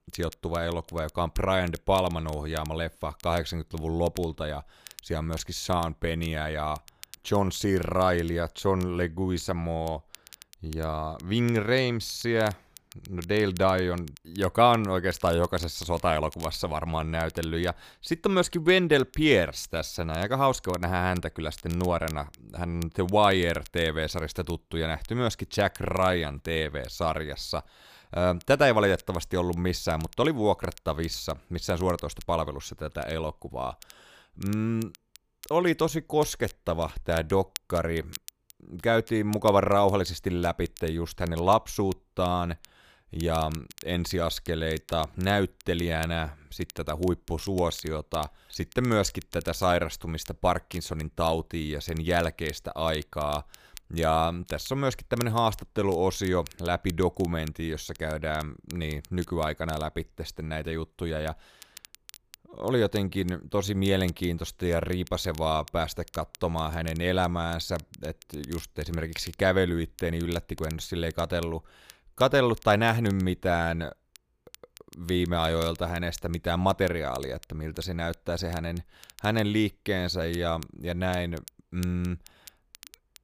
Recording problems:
crackle, like an old record; faint; 20 dB below the speech

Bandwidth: 15 kHz